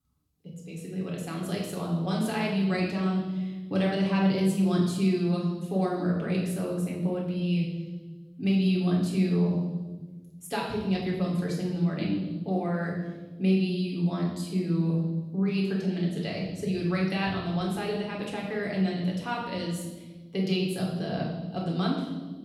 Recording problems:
off-mic speech; far
room echo; noticeable; dies away in 1.4 s

